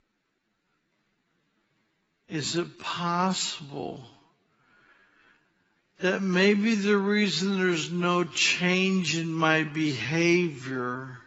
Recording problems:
garbled, watery; badly; nothing above 7.5 kHz
wrong speed, natural pitch; too slow; 0.5 times normal speed

